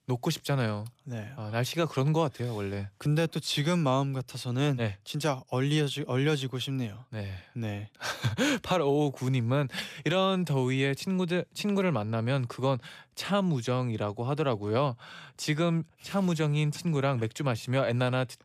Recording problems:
none

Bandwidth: 14.5 kHz